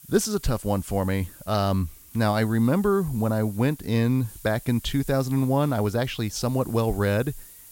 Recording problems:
hiss; noticeable; throughout; 20 dB below the speech

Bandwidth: 16.5 kHz